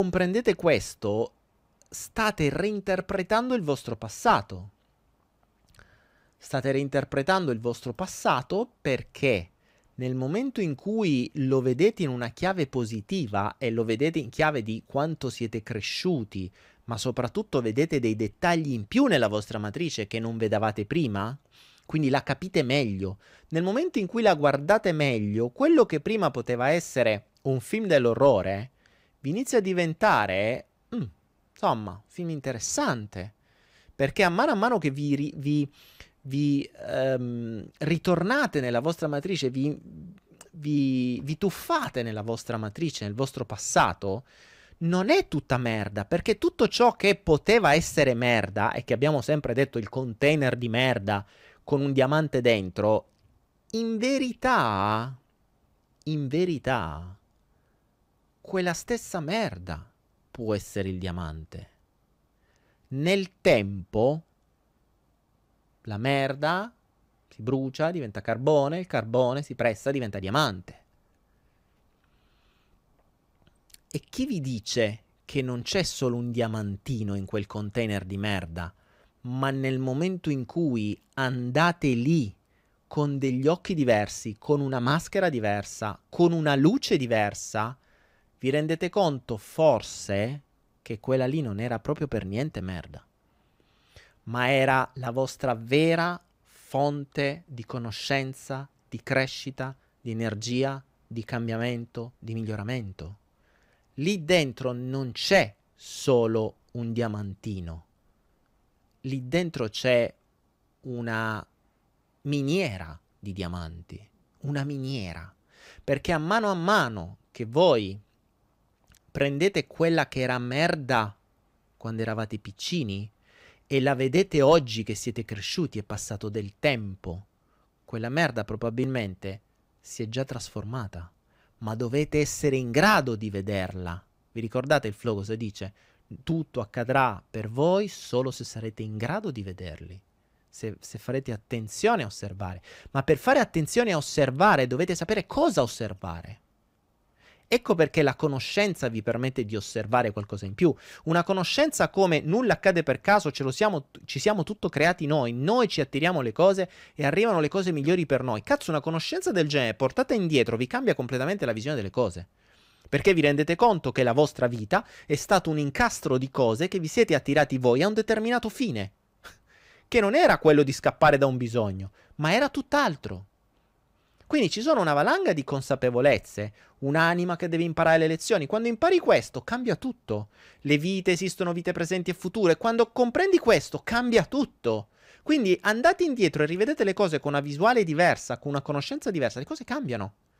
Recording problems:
abrupt cut into speech; at the start

